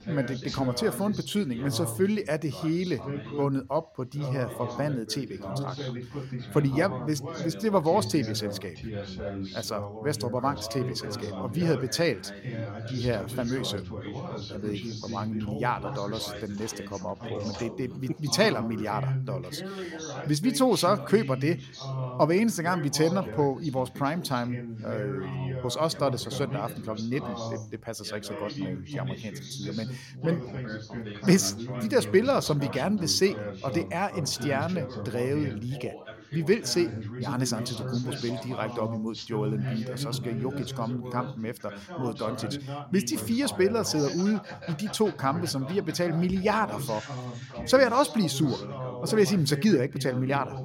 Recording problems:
background chatter; loud; throughout; 2 voices, 8 dB below the speech

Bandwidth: 16 kHz